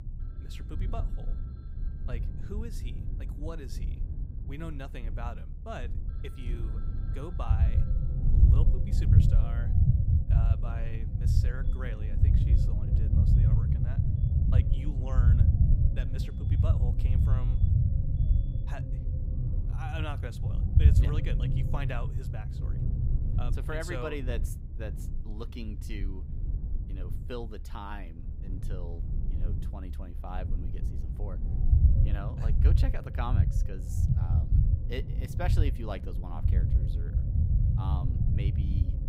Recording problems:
low rumble; loud; throughout; as loud as the speech
alarms or sirens; faint; throughout; 25 dB below the speech

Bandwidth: 15.5 kHz